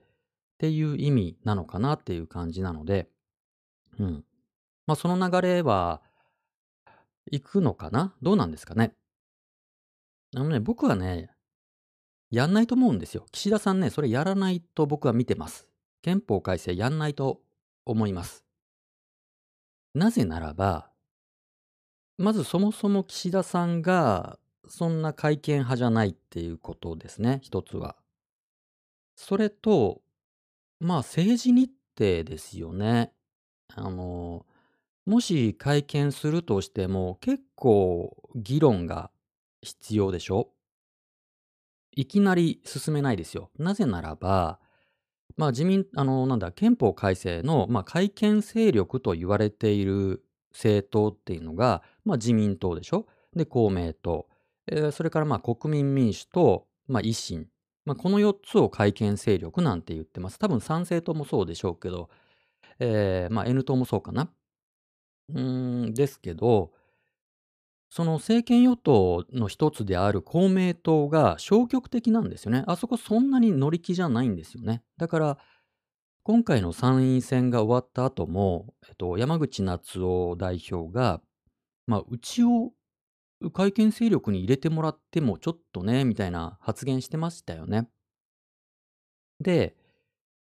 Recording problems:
none

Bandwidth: 14.5 kHz